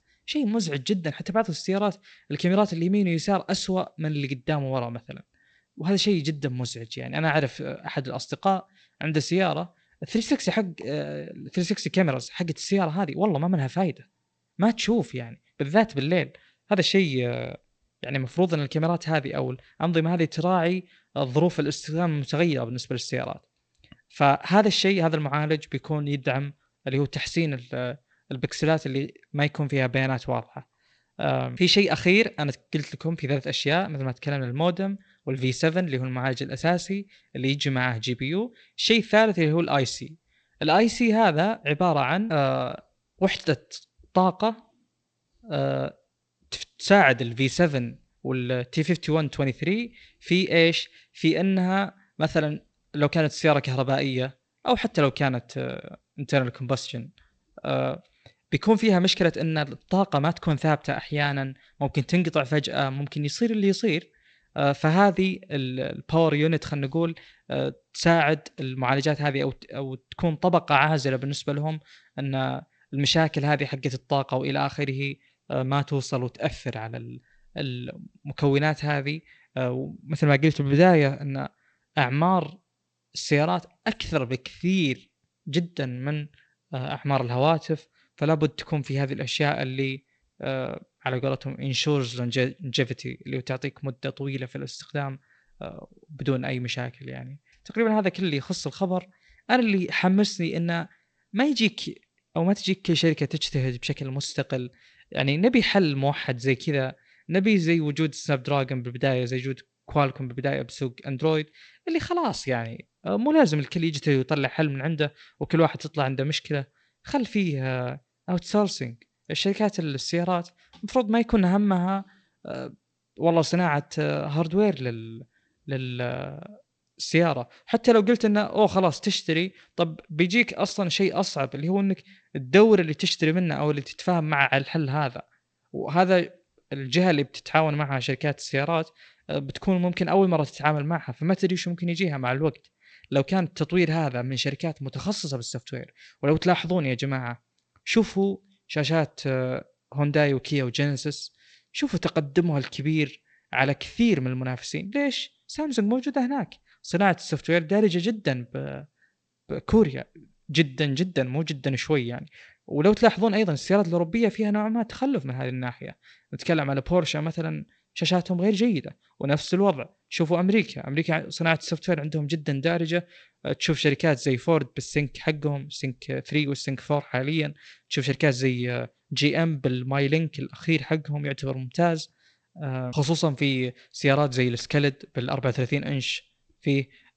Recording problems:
garbled, watery; slightly; nothing above 8 kHz

